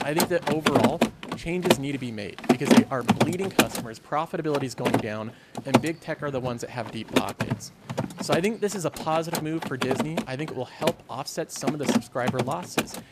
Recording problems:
machinery noise; very loud; throughout; 4 dB above the speech
murmuring crowd; faint; throughout; 25 dB below the speech

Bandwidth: 14.5 kHz